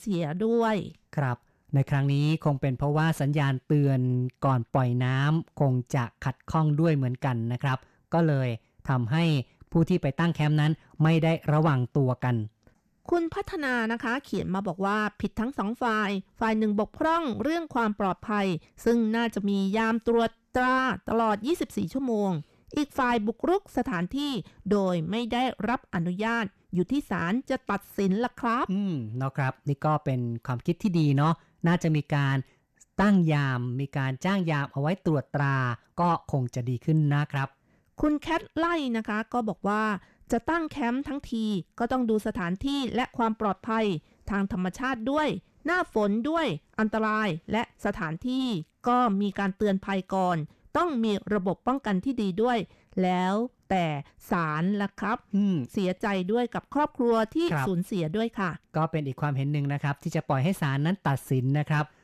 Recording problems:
distortion; slight; 10 dB below the speech

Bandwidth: 14 kHz